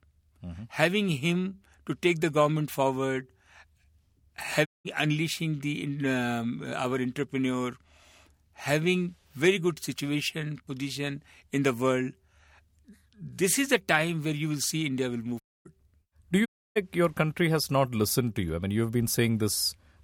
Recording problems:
audio cutting out; at 4.5 s, at 15 s and at 16 s

